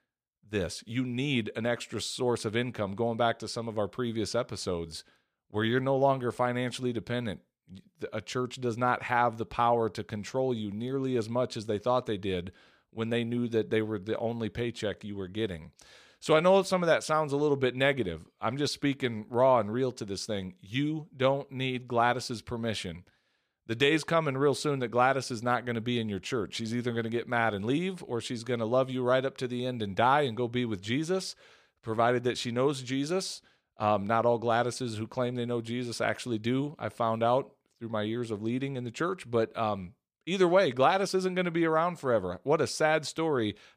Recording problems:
none

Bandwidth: 14.5 kHz